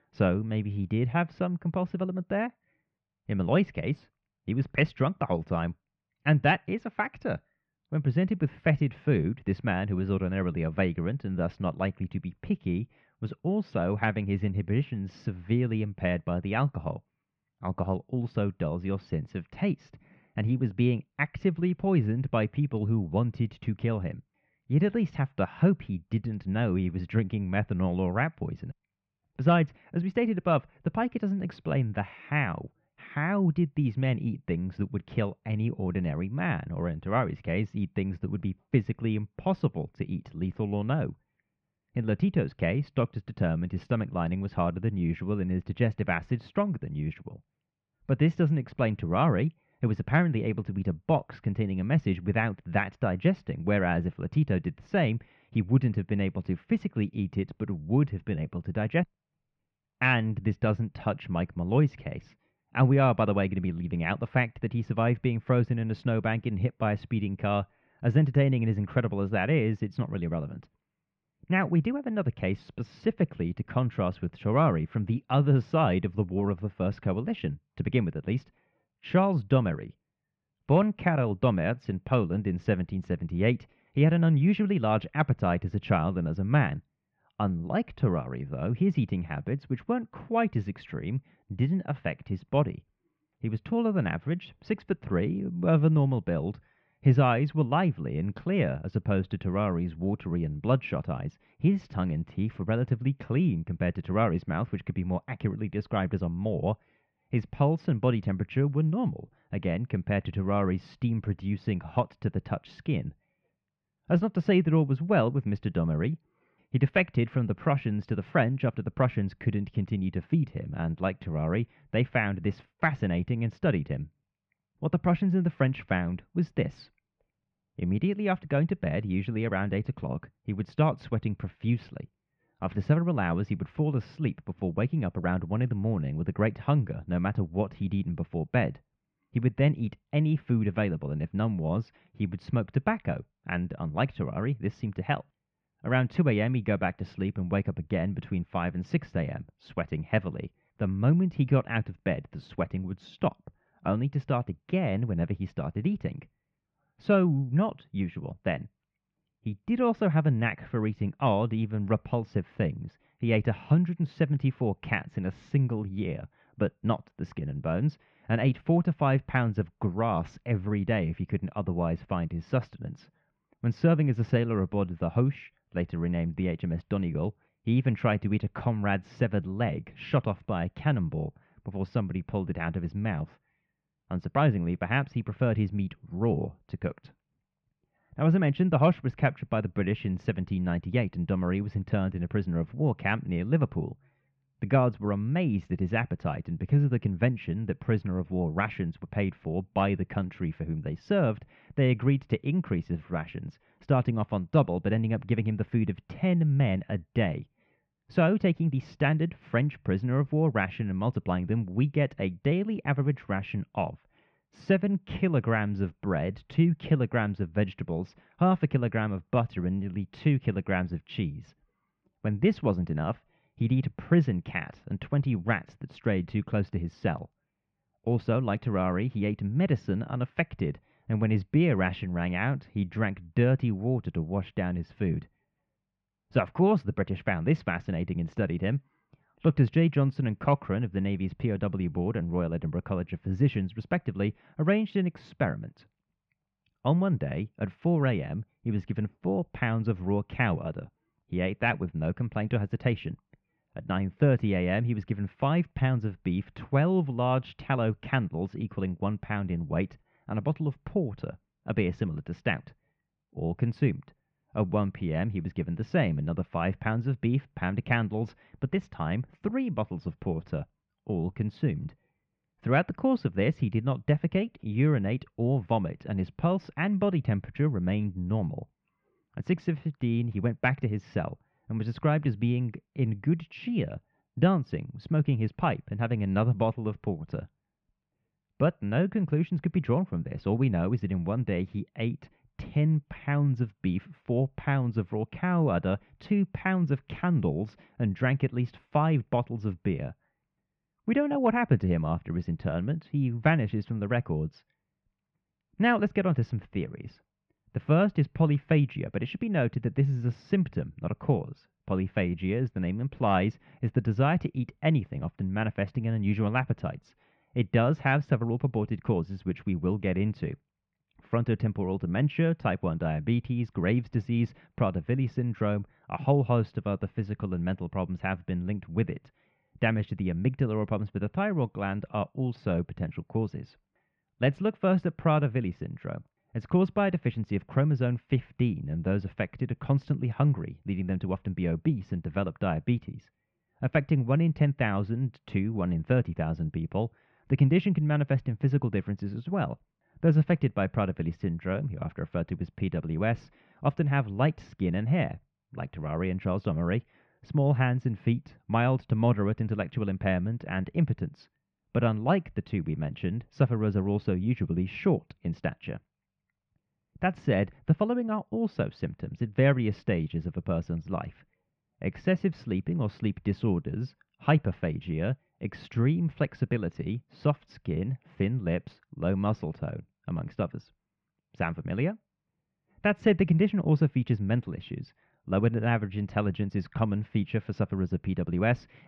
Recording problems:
muffled; very; fading above 2.5 kHz

